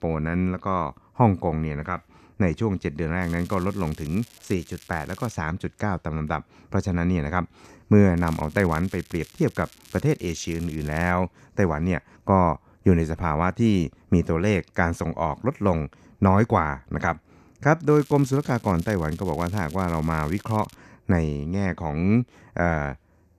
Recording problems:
crackling; faint; from 3 to 5.5 s, from 8 to 11 s and from 18 to 21 s; 25 dB below the speech

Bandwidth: 14 kHz